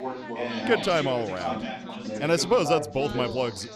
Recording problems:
background chatter; loud; throughout; 4 voices, 7 dB below the speech

